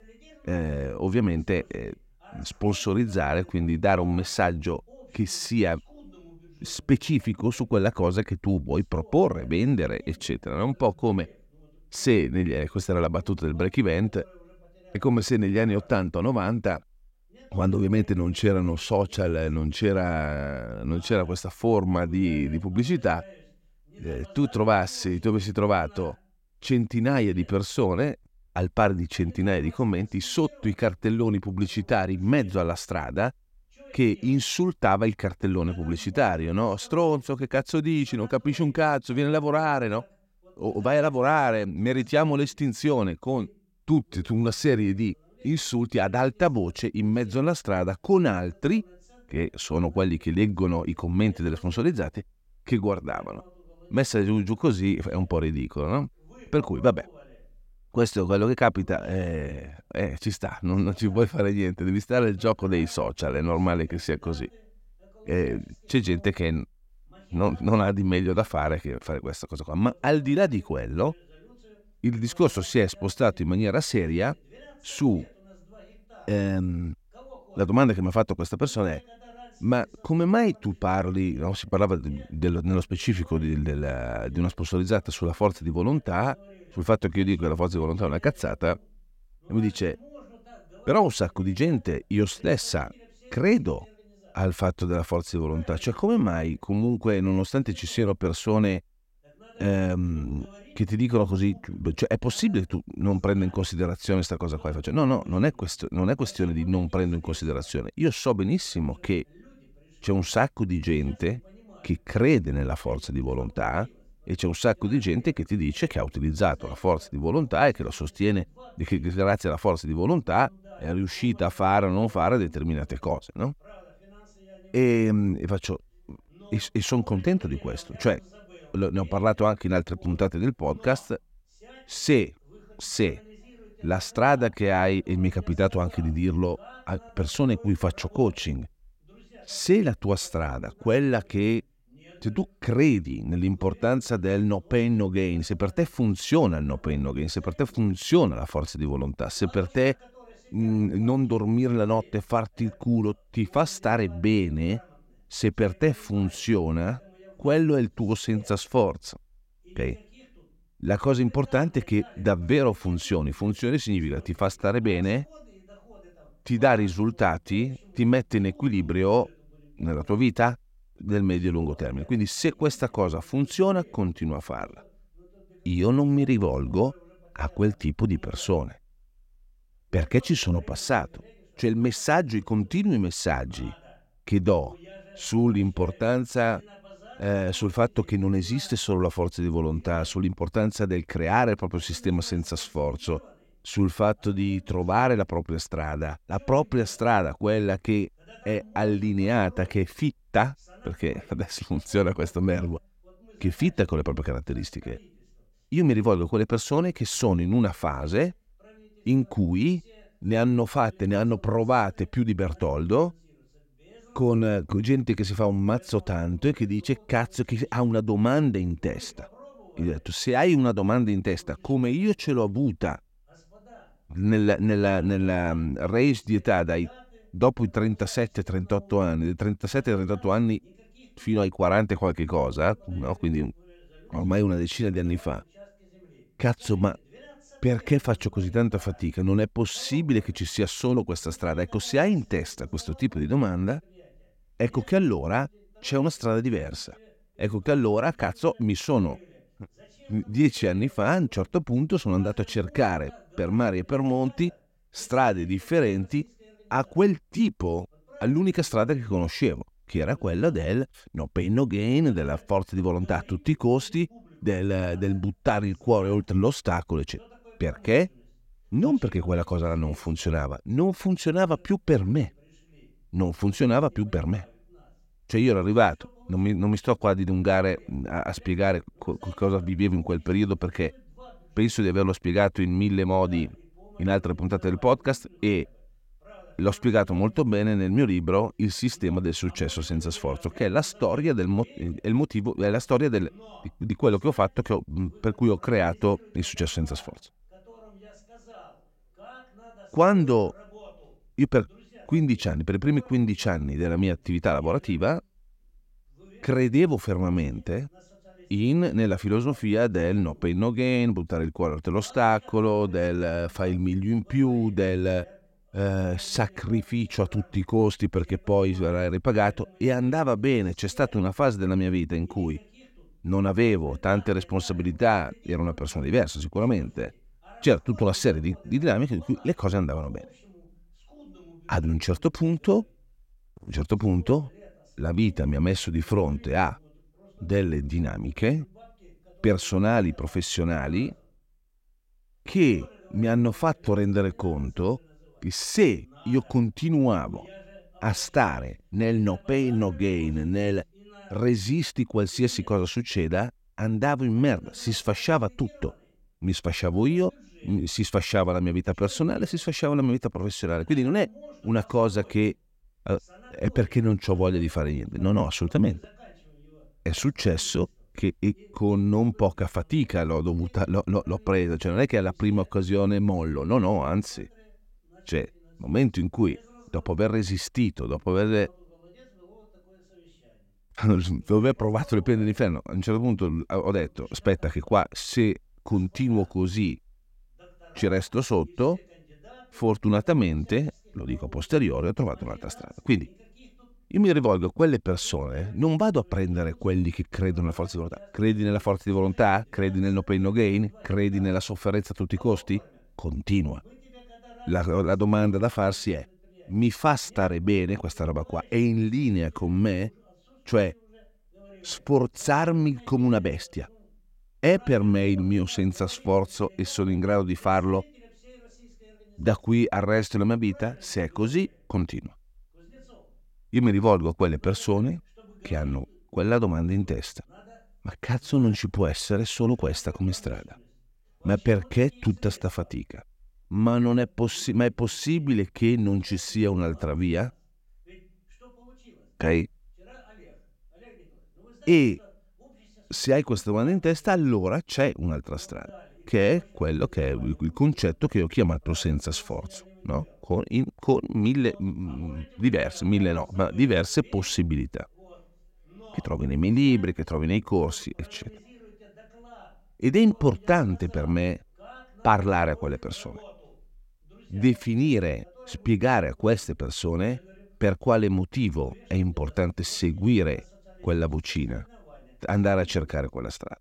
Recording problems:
voice in the background; faint; throughout; 25 dB below the speech

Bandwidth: 16 kHz